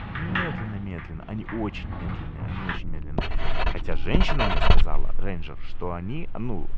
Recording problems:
muffled; very; fading above 3 kHz
household noises; very loud; throughout; 5 dB above the speech
low rumble; noticeable; throughout; 15 dB below the speech

